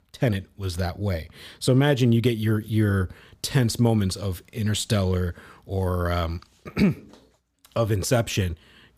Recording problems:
none

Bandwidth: 15 kHz